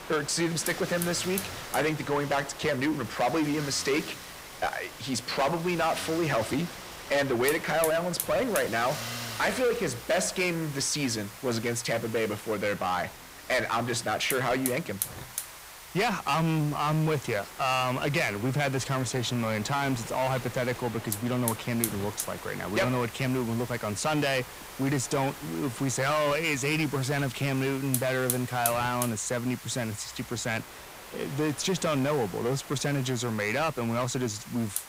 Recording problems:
distortion; heavy; 7 dB below the speech
traffic noise; noticeable; throughout; 15 dB below the speech
wind noise on the microphone; occasional gusts; 20 dB below the speech
hiss; noticeable; throughout; 10 dB below the speech

